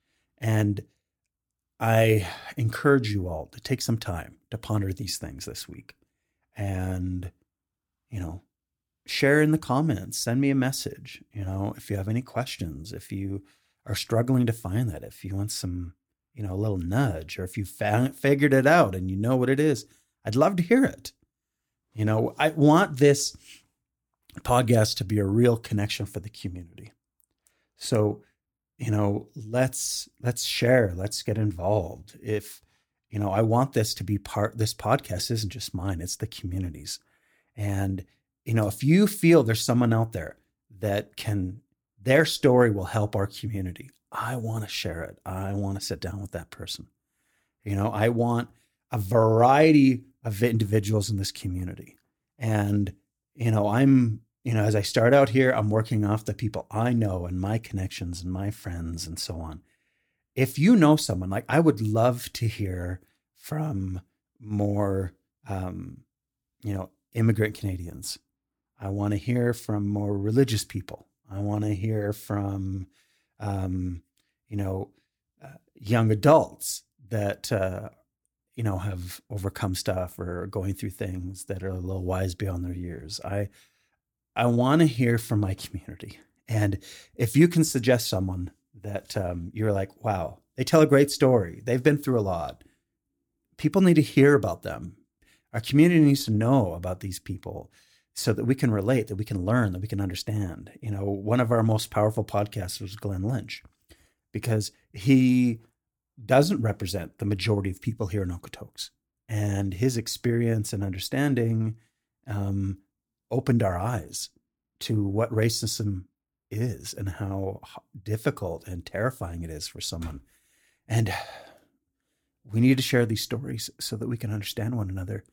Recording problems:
none

